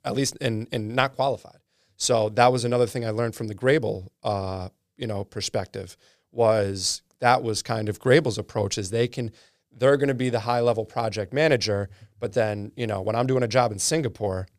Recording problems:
none

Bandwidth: 15 kHz